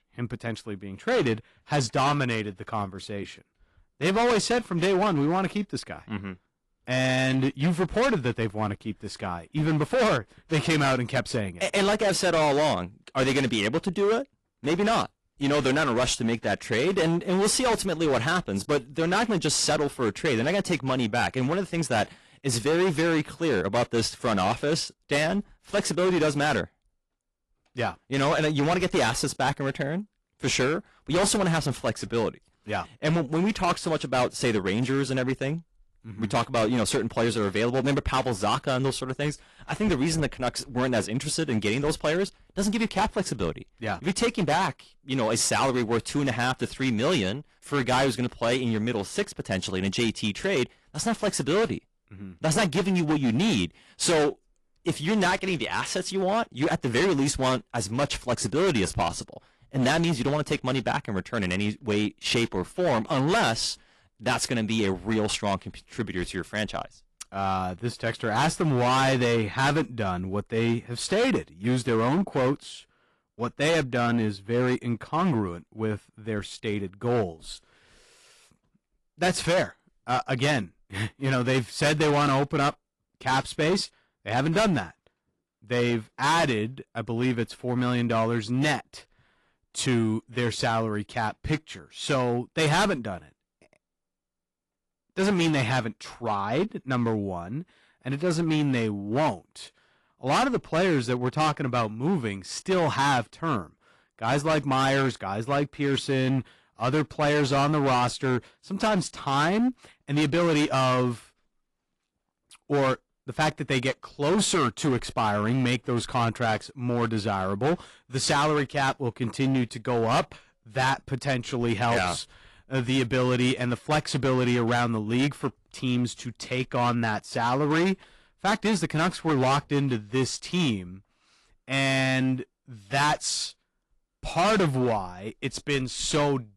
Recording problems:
distortion; heavy; 13% of the sound clipped
garbled, watery; slightly; nothing above 11 kHz

